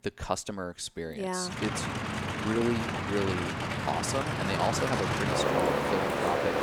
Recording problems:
train or aircraft noise; very loud; from 1.5 s on; 3 dB above the speech

